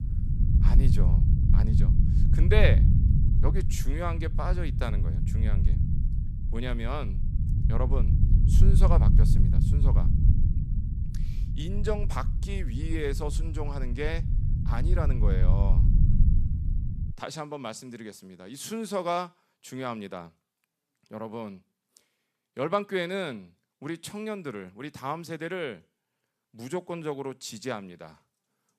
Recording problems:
low rumble; loud; until 17 s; 7 dB below the speech

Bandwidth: 14.5 kHz